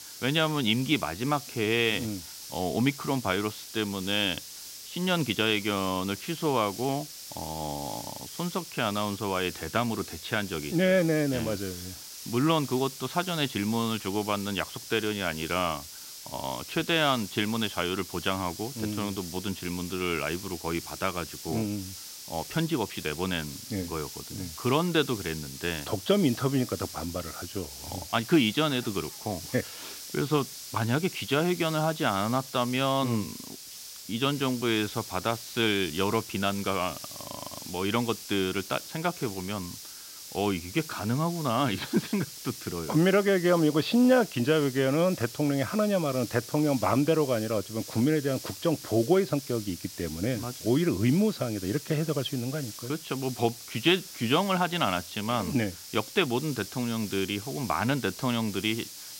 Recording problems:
high frequencies cut off; severe; nothing above 5 kHz
hiss; noticeable; throughout; 10 dB below the speech

